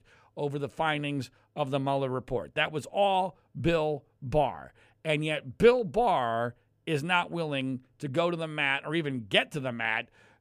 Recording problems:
none

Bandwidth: 15 kHz